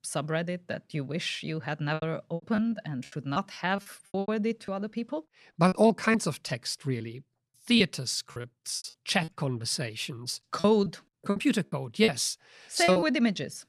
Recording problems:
choppy; very; 10% of the speech affected

